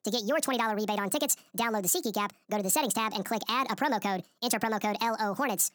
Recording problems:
wrong speed and pitch; too fast and too high; 1.6 times normal speed

